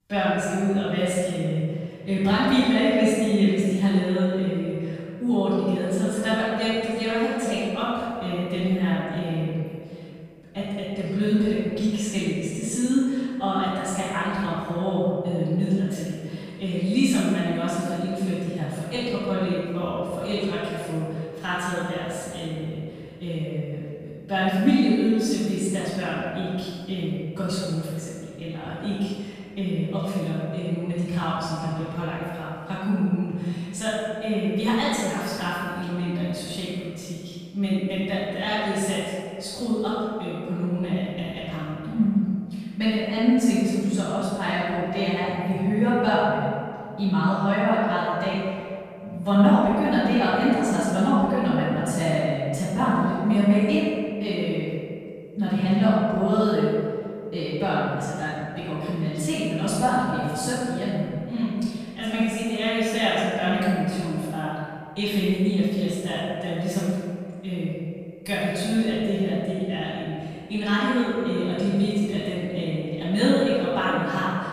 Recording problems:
room echo; strong; dies away in 2.1 s
off-mic speech; far

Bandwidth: 15 kHz